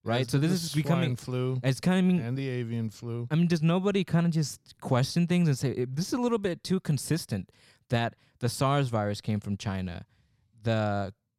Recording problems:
none

